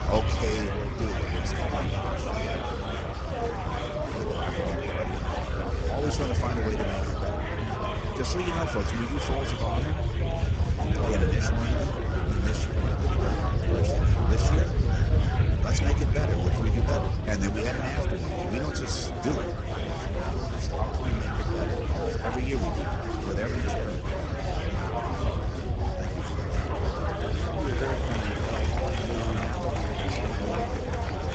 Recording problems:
garbled, watery; badly; nothing above 7.5 kHz
murmuring crowd; very loud; throughout; 1 dB above the speech
low rumble; loud; throughout; 9 dB below the speech

